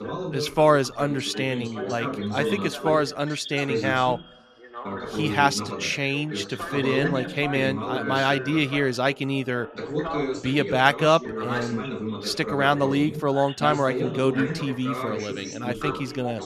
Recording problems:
background chatter; loud; throughout; 3 voices, 6 dB below the speech

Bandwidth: 14 kHz